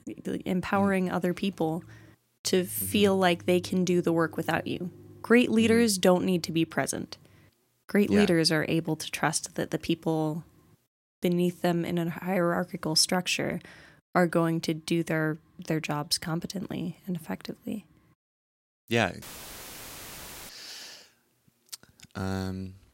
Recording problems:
audio cutting out; filled with static; at 19 s for 1.5 s

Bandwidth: 16 kHz